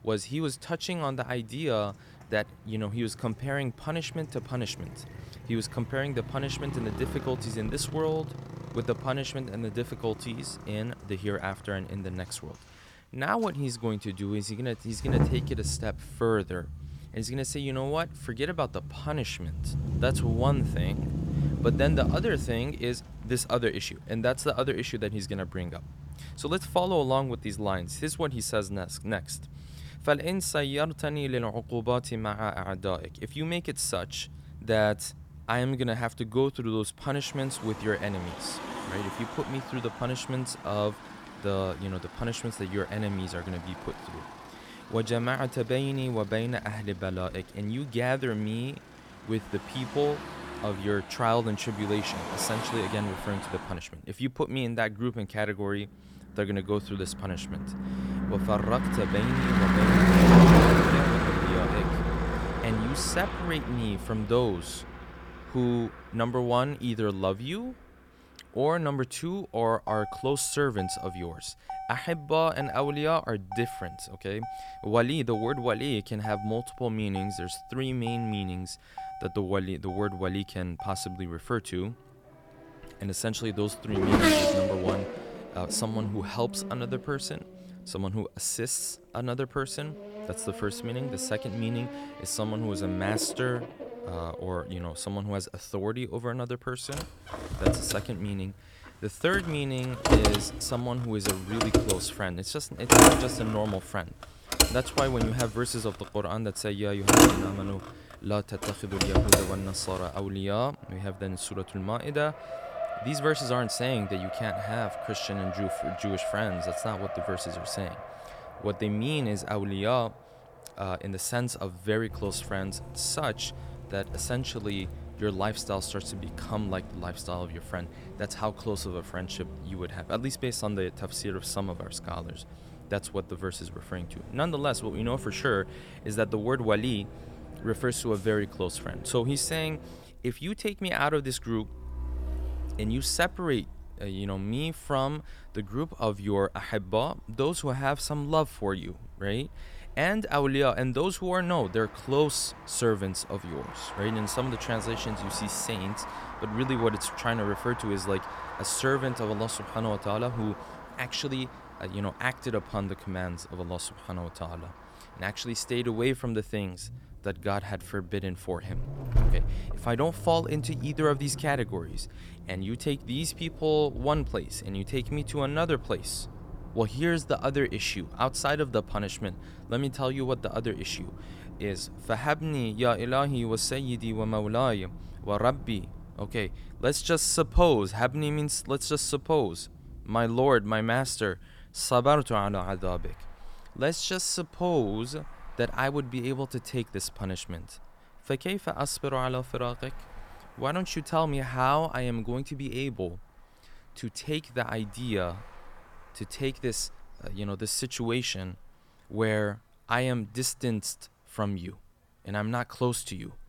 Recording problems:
traffic noise; very loud; throughout; as loud as the speech

